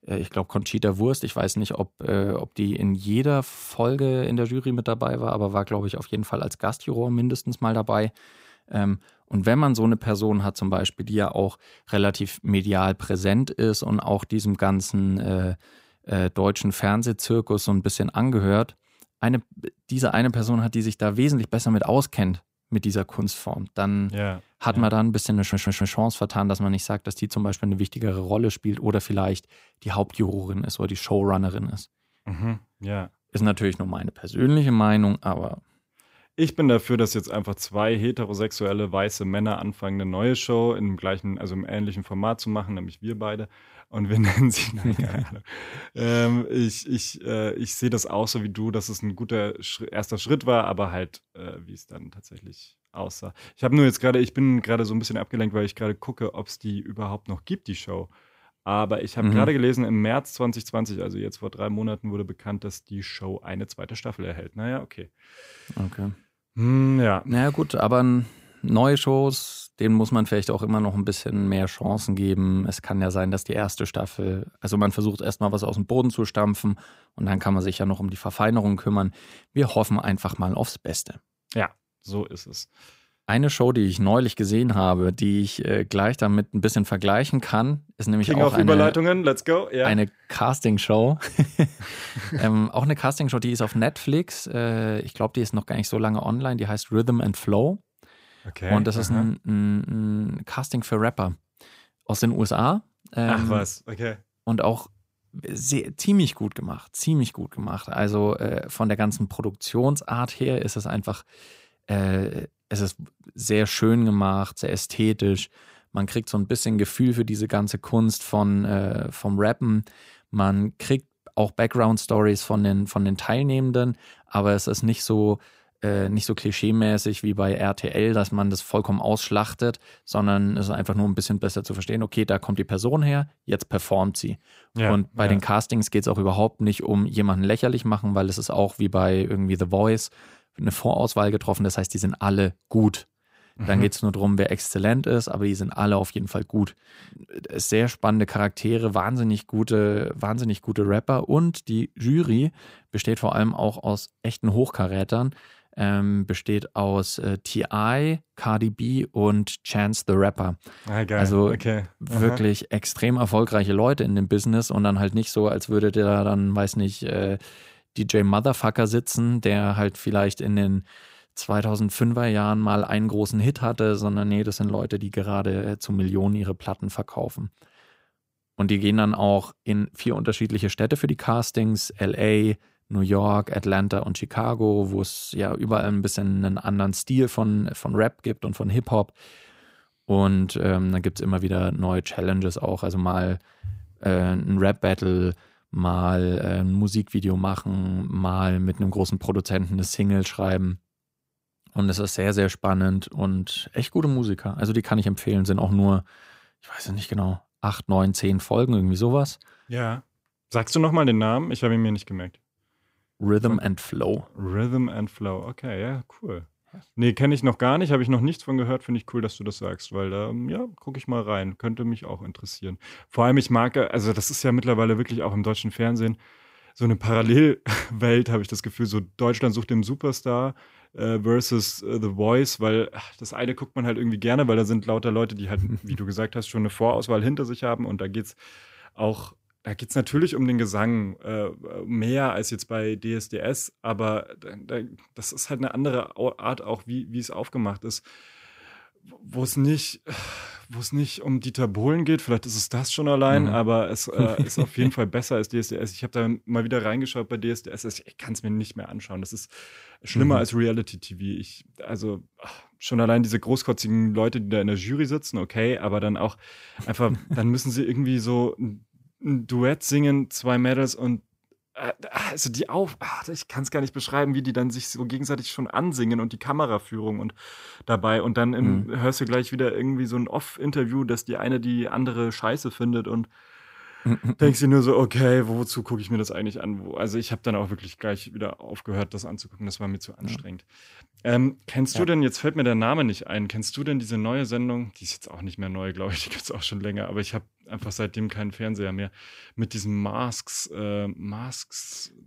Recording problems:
audio stuttering; at 25 s

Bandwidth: 15.5 kHz